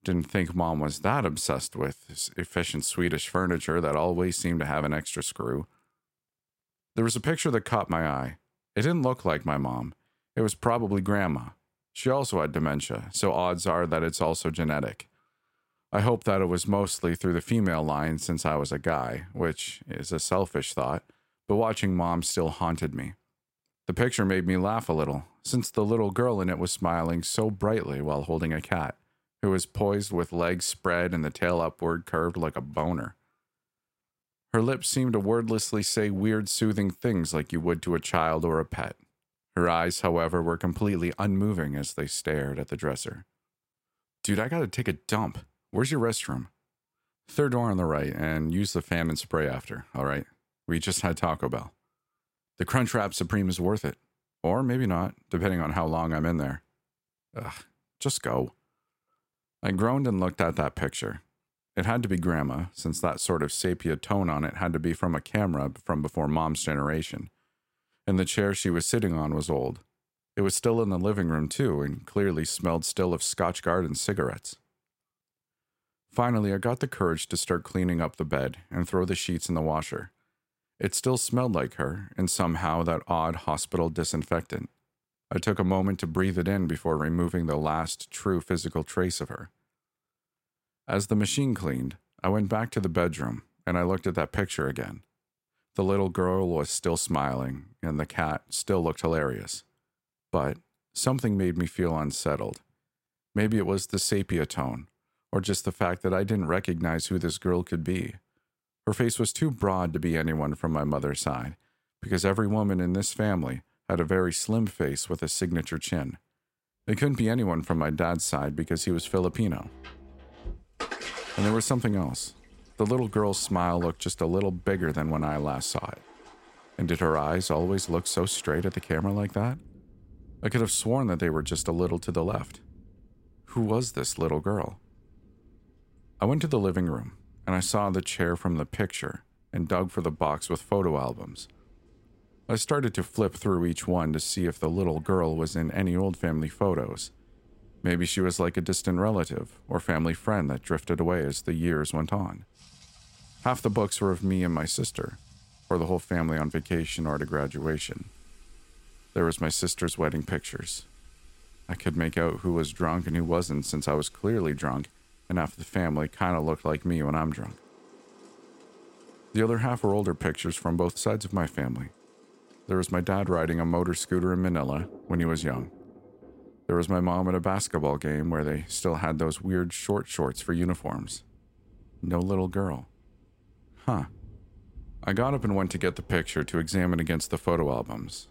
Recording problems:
rain or running water; faint; from 1:57 on; 20 dB below the speech

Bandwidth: 16 kHz